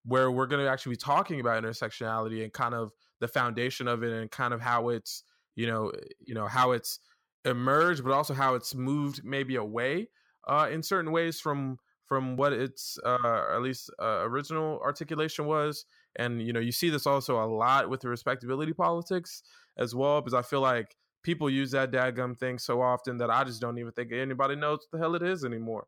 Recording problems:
none

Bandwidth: 17 kHz